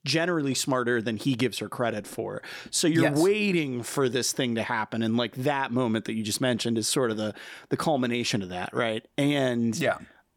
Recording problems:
none

